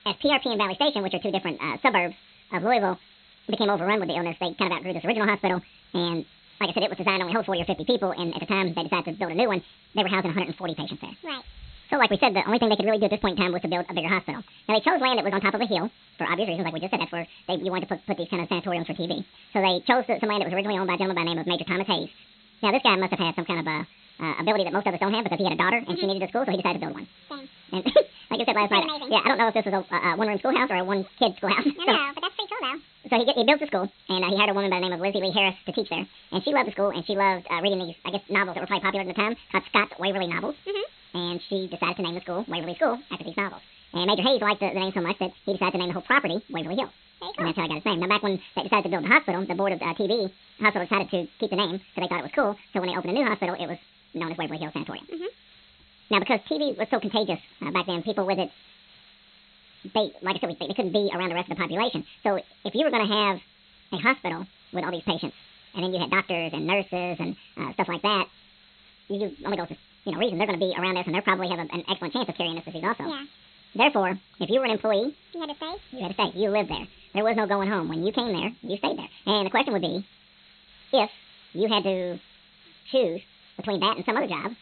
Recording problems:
high frequencies cut off; severe; nothing above 4 kHz
wrong speed and pitch; too fast and too high; 1.7 times normal speed
hiss; faint; throughout; 25 dB below the speech

